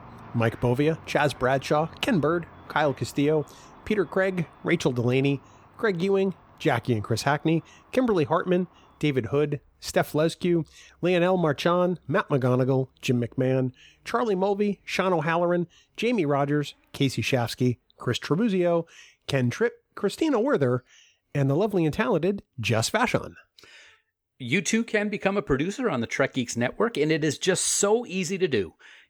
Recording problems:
traffic noise; faint; throughout; 25 dB below the speech

